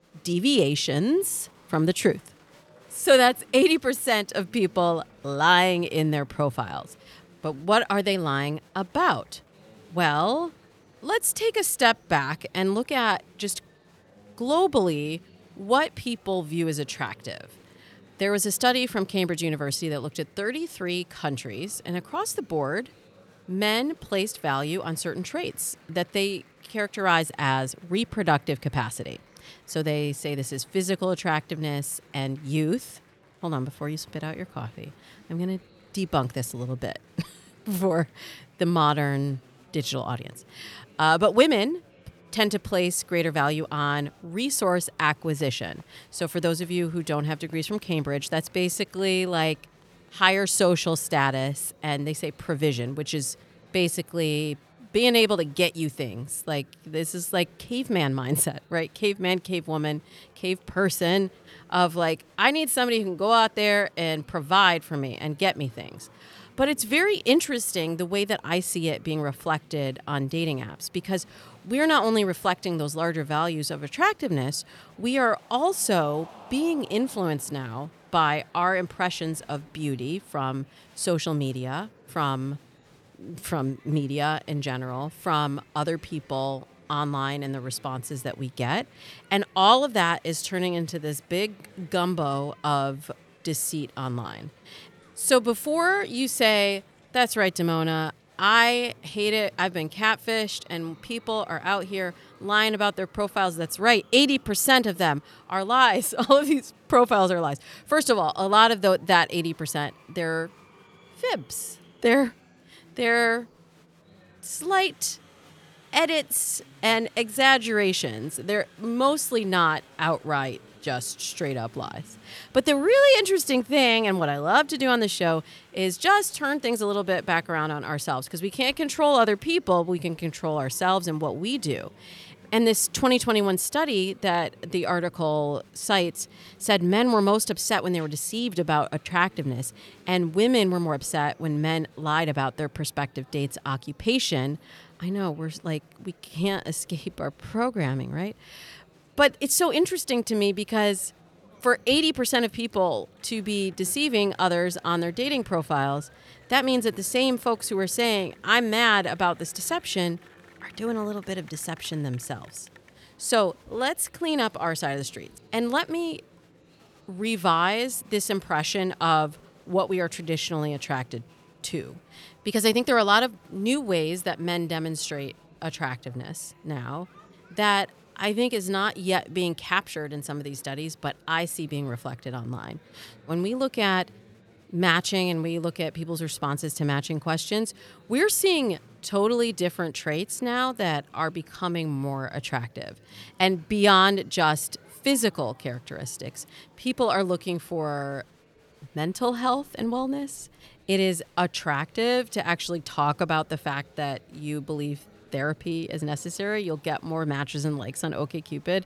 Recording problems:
murmuring crowd; faint; throughout; 30 dB below the speech

